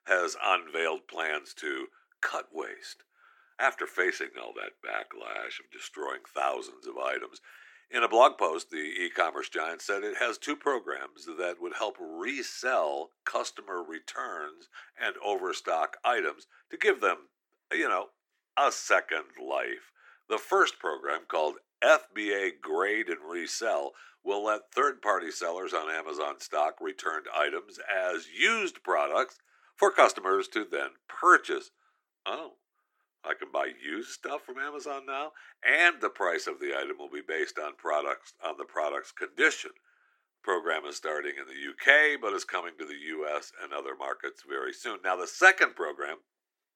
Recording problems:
thin; very; fading below 350 Hz

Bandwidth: 18 kHz